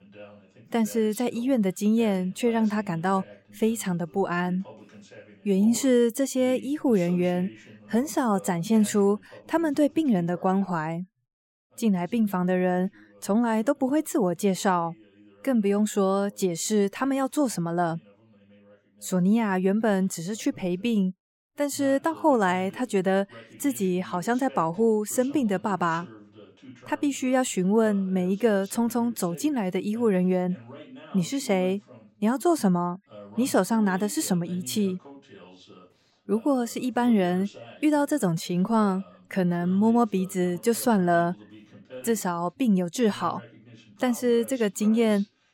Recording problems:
voice in the background; faint; throughout; 25 dB below the speech

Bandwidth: 16.5 kHz